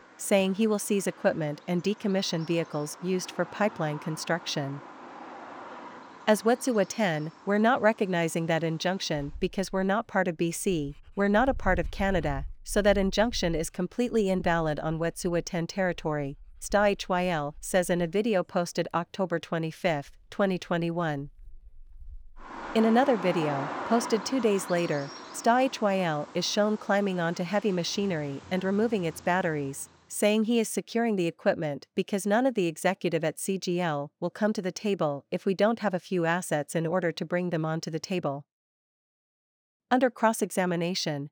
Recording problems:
animal sounds; noticeable; until 30 s; 15 dB below the speech

